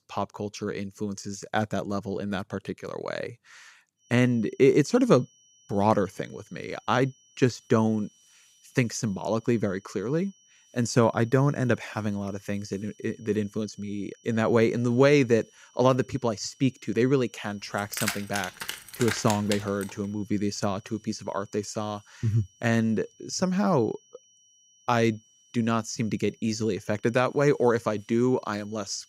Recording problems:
high-pitched whine; faint; from 4 s on; 6 kHz, 30 dB below the speech
jangling keys; noticeable; from 18 to 20 s; peak 4 dB below the speech

